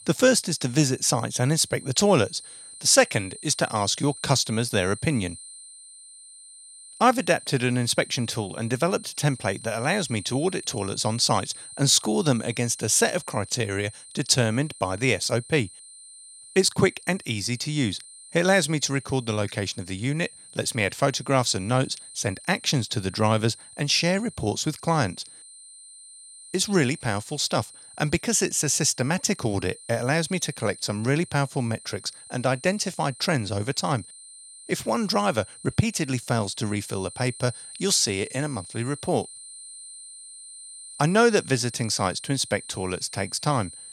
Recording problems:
high-pitched whine; noticeable; throughout; 9 kHz, 15 dB below the speech

